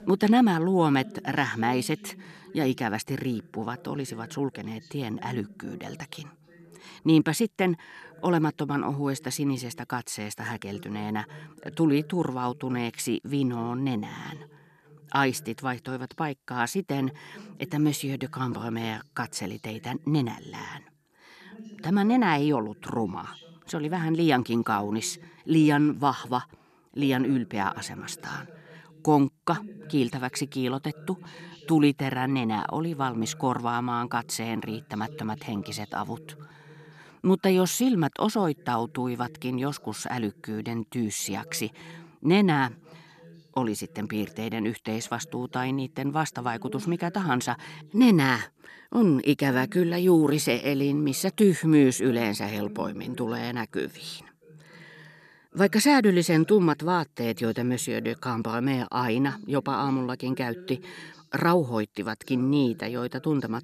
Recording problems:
voice in the background; faint; throughout; 20 dB below the speech

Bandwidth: 13.5 kHz